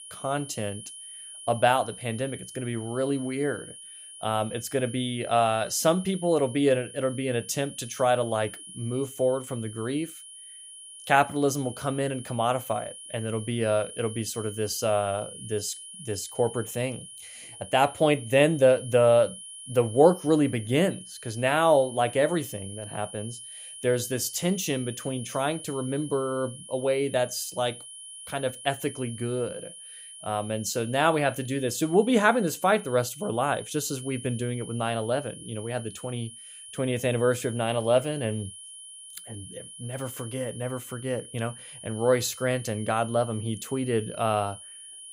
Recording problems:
high-pitched whine; noticeable; throughout; 10.5 kHz, 15 dB below the speech

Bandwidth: 15.5 kHz